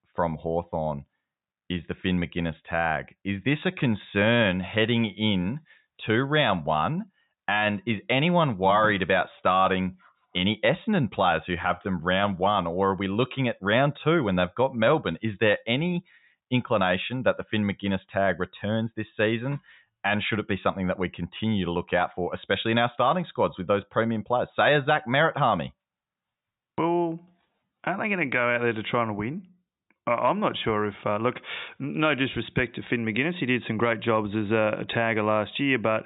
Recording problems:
high frequencies cut off; severe; nothing above 4 kHz

